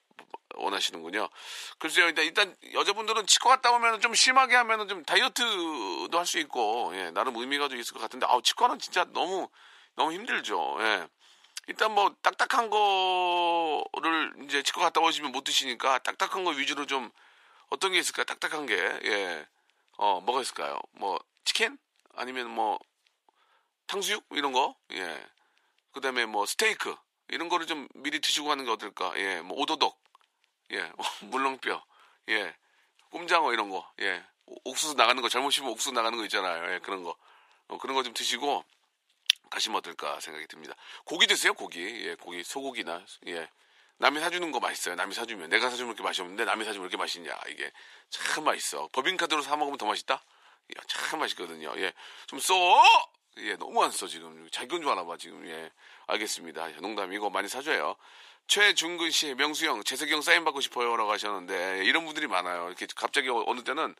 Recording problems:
thin; very; fading below 450 Hz

